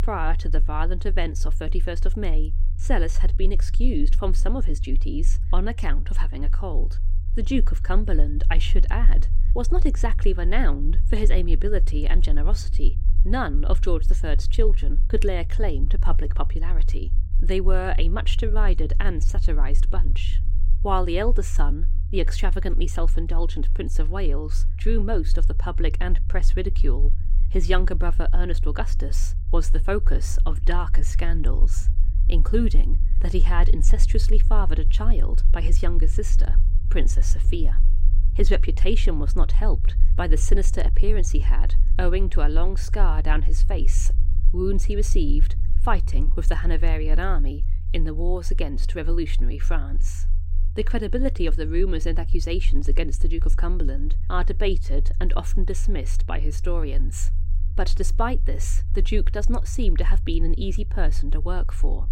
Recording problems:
low rumble; noticeable; throughout; 15 dB below the speech

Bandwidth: 16 kHz